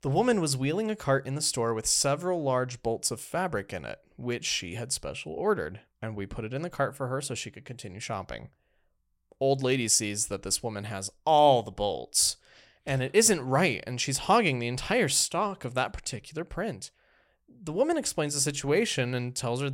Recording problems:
abrupt cut into speech; at the end

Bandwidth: 16.5 kHz